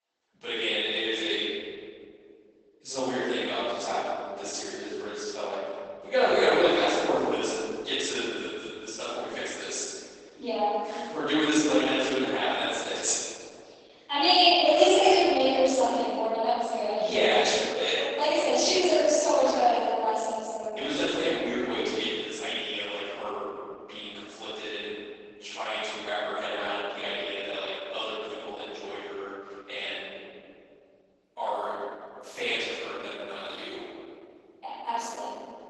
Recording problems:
room echo; strong; dies away in 2.5 s
off-mic speech; far
garbled, watery; badly; nothing above 8 kHz
thin; very slightly; fading below 300 Hz

